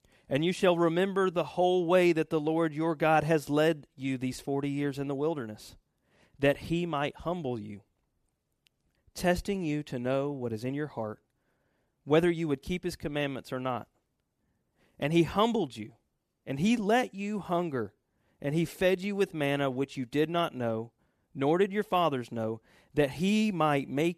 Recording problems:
none

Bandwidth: 14.5 kHz